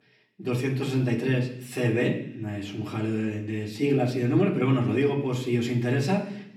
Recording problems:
off-mic speech; far
room echo; slight; dies away in 0.8 s

